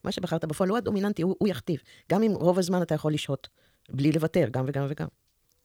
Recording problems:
wrong speed, natural pitch; too fast; 1.6 times normal speed

